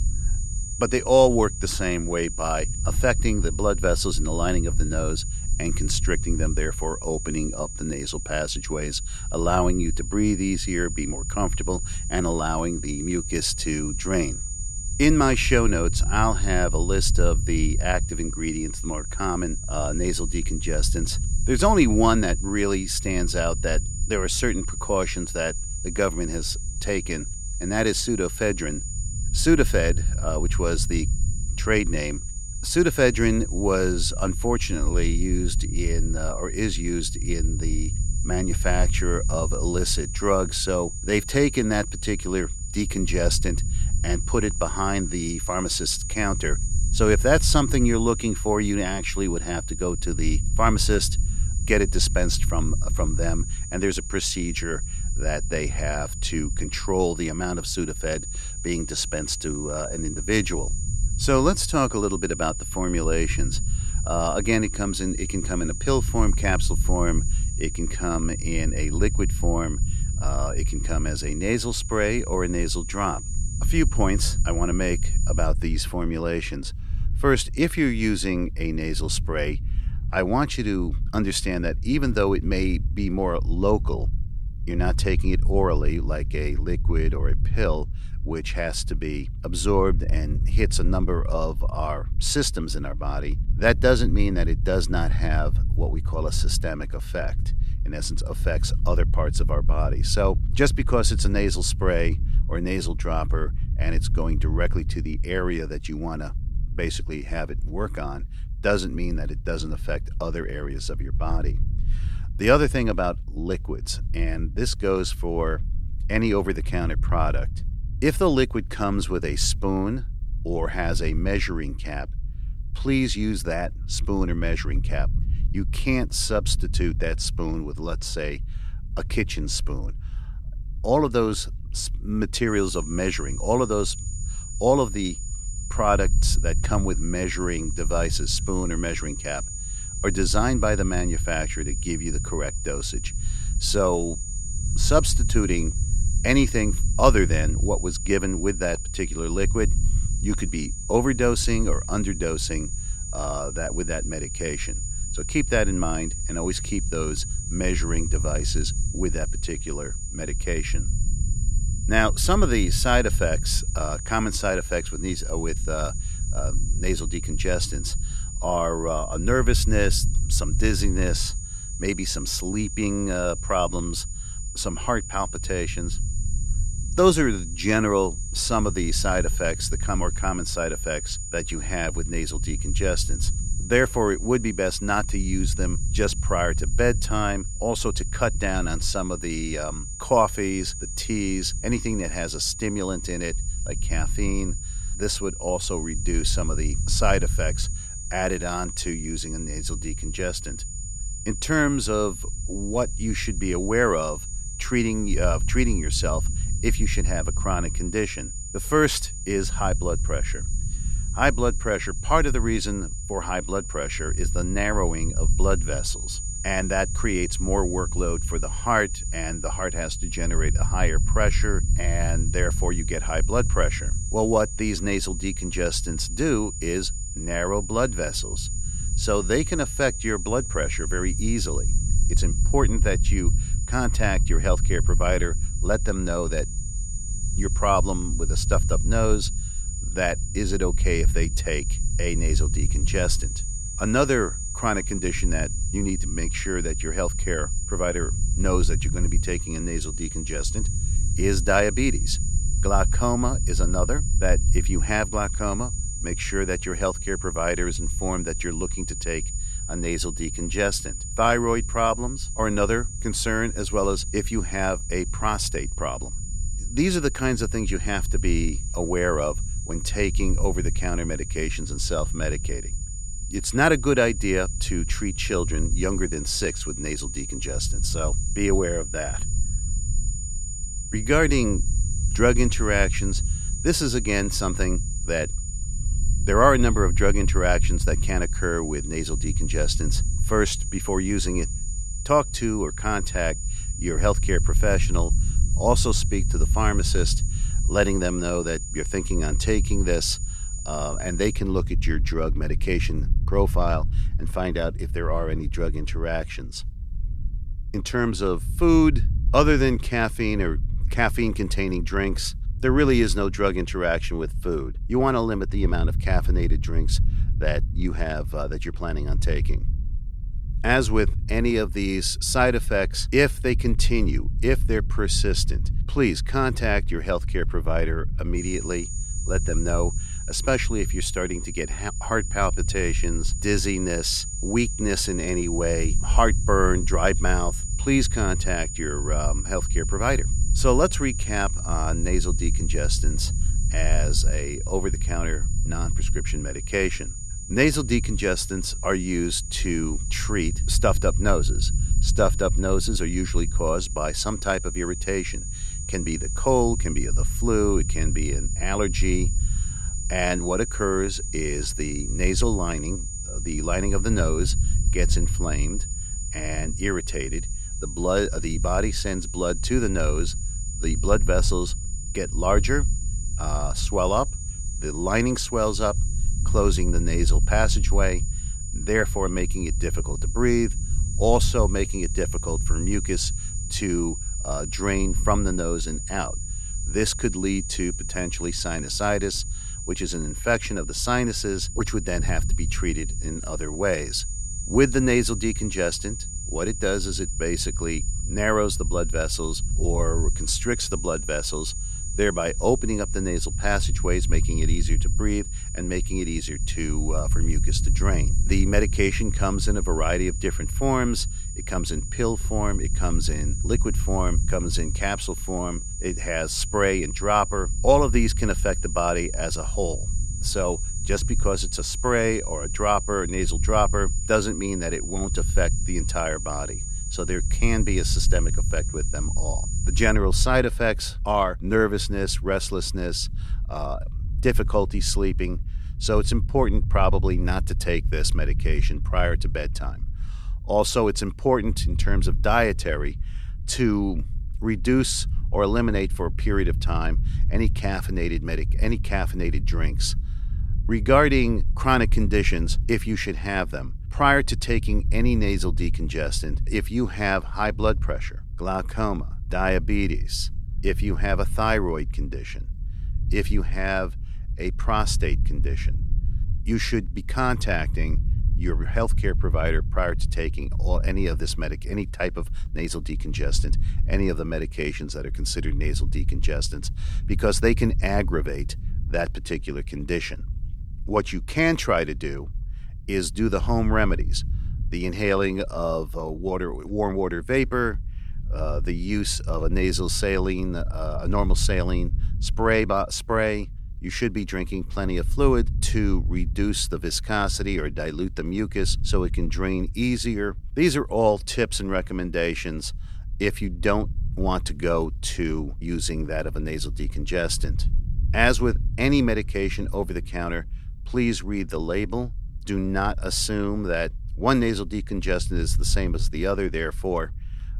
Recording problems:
high-pitched whine; loud; until 1:15, from 2:12 to 5:01 and from 5:28 to 7:10; 7 kHz, 8 dB below the speech
low rumble; faint; throughout; 20 dB below the speech

